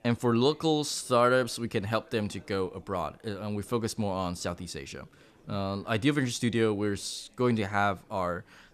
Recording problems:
chatter from many people; faint; throughout; 30 dB below the speech

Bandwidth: 14 kHz